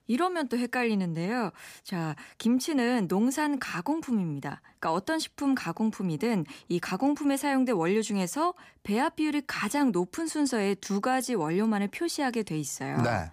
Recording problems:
none

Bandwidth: 15 kHz